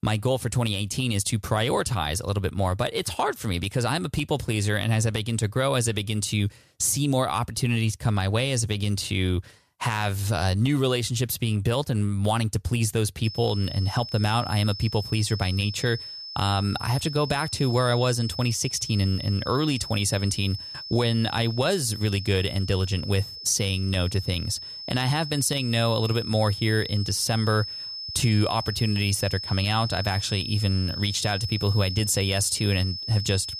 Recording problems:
high-pitched whine; loud; from 13 s on; 5 kHz, 8 dB below the speech

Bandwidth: 14.5 kHz